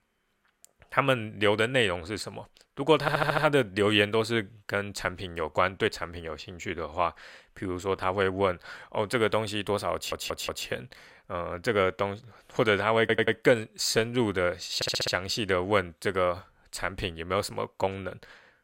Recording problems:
audio stuttering; 4 times, first at 3 s

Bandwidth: 16 kHz